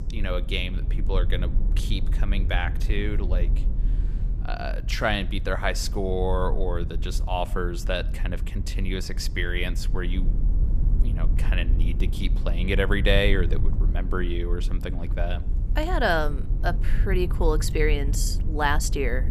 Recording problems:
low rumble; noticeable; throughout; 15 dB below the speech

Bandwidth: 14.5 kHz